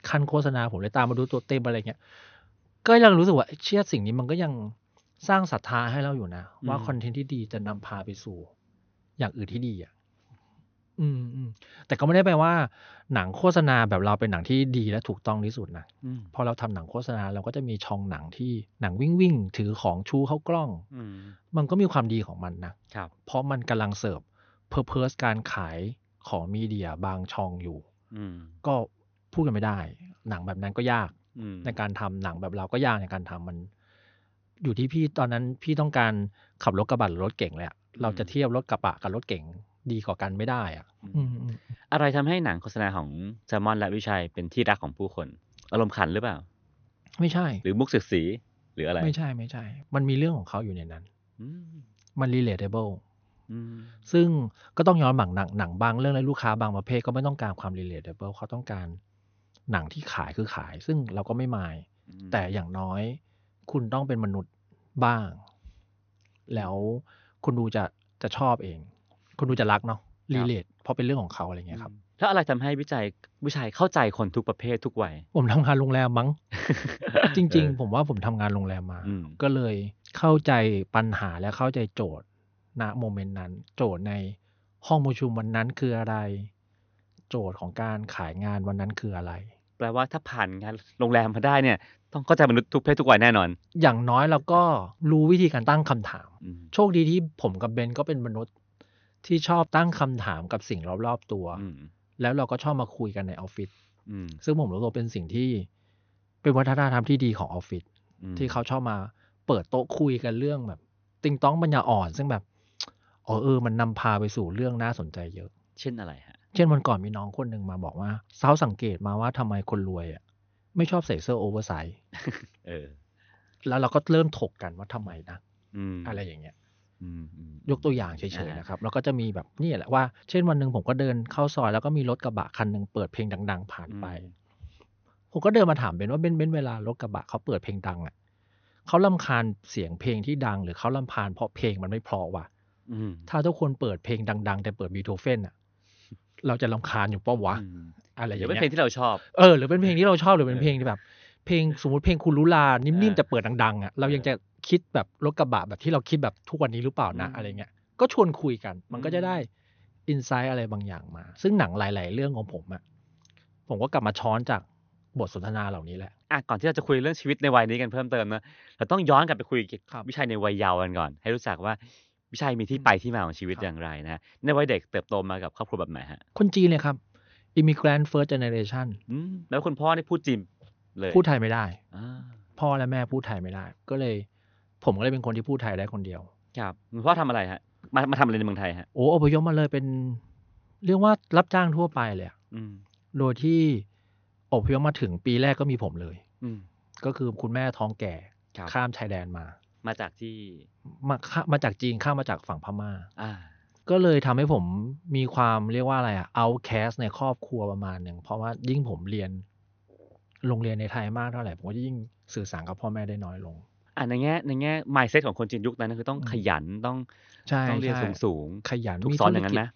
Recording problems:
high frequencies cut off; noticeable; nothing above 6.5 kHz

